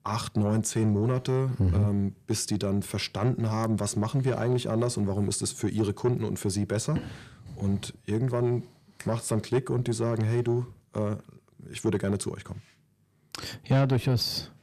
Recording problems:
distortion; slight; 10 dB below the speech

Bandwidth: 14.5 kHz